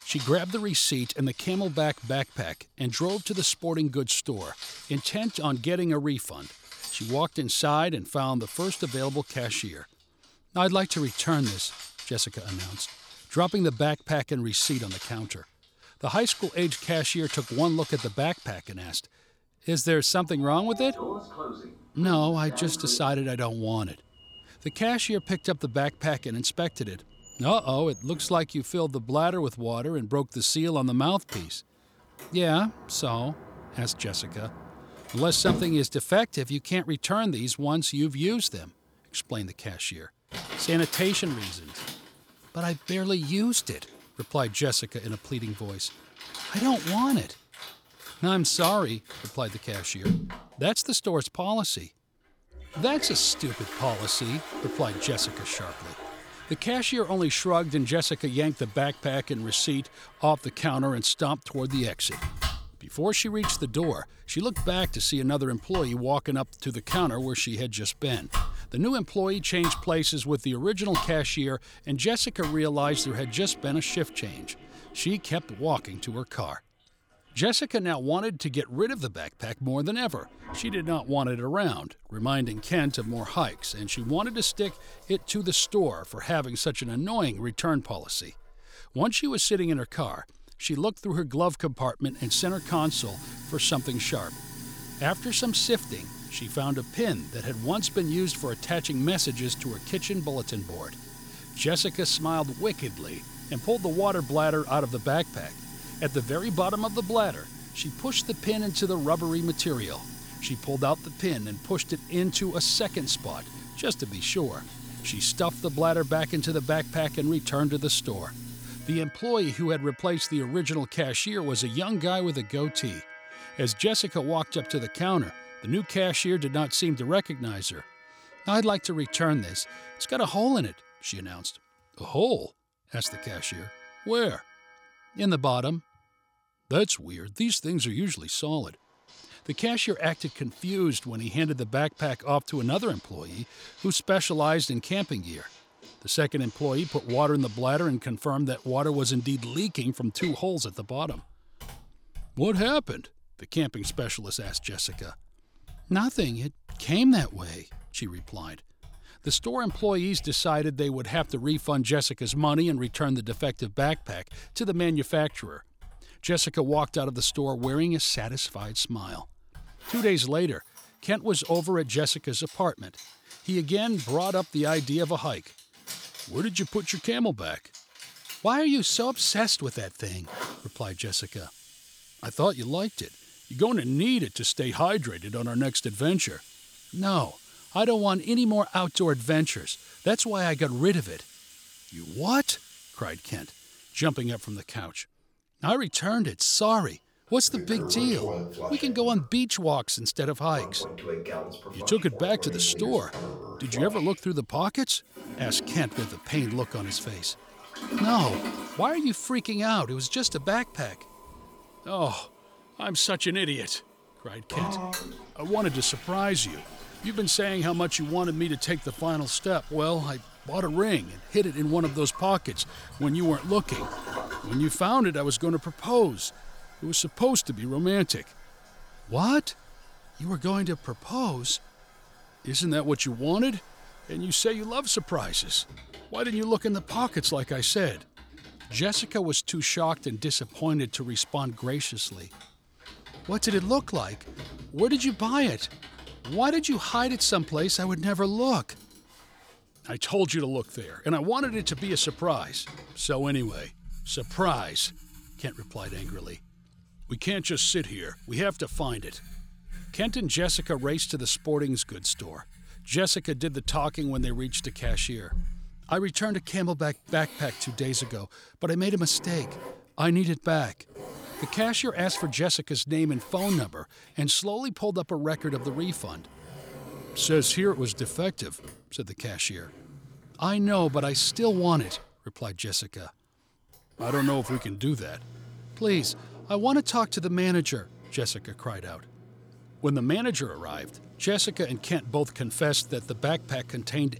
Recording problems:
household noises; noticeable; throughout; 15 dB below the speech

